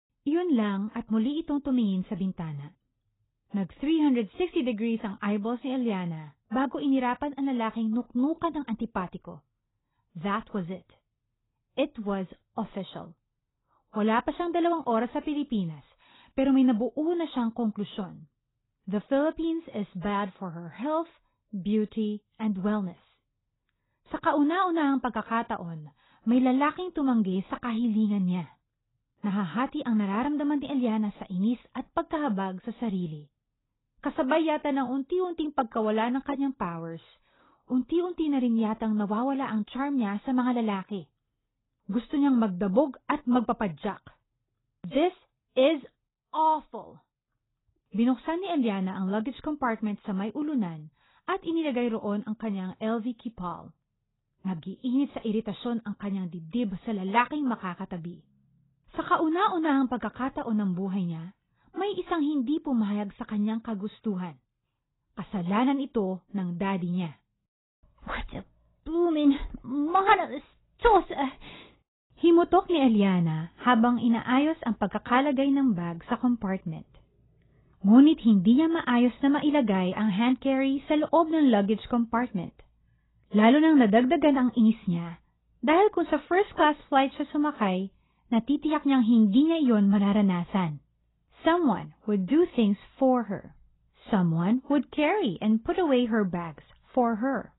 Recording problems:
garbled, watery; badly; nothing above 4 kHz

